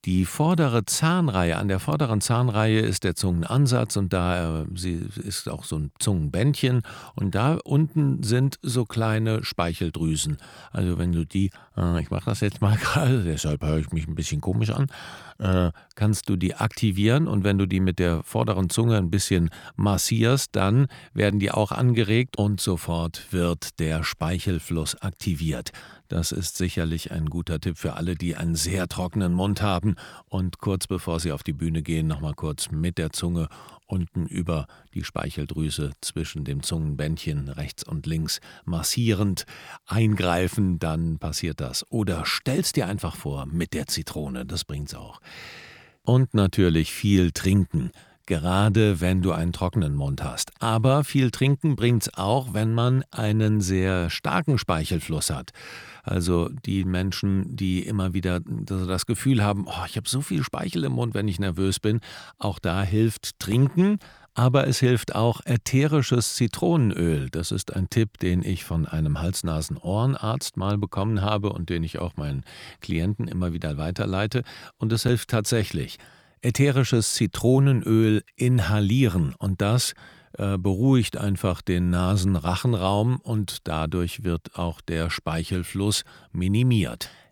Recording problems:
none

